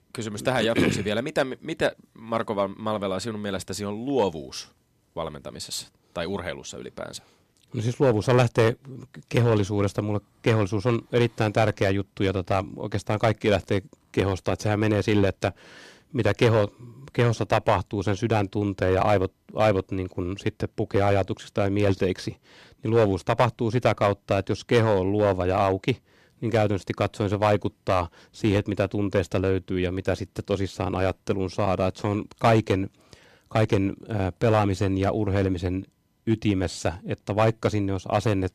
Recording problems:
distortion; slight; 1.8% of the sound clipped

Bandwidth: 13.5 kHz